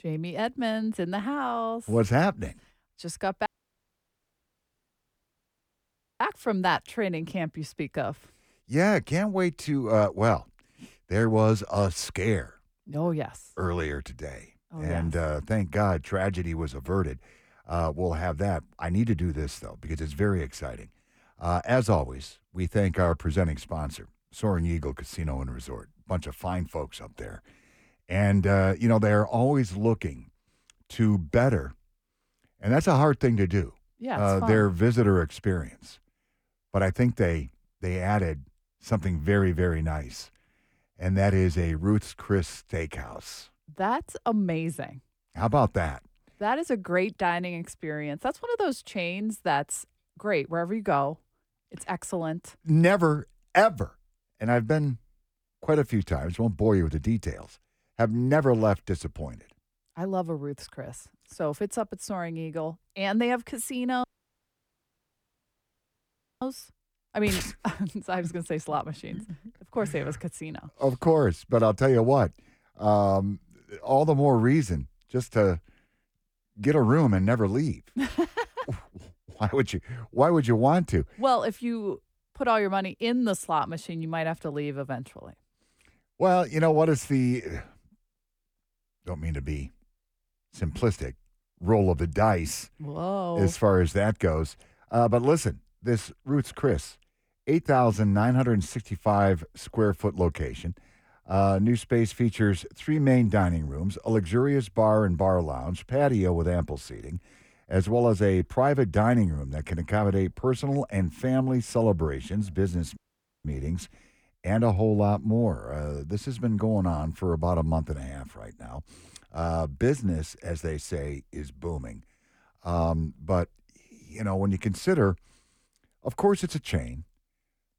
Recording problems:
audio cutting out; at 3.5 s for 2.5 s, at 1:04 for 2.5 s and at 1:53

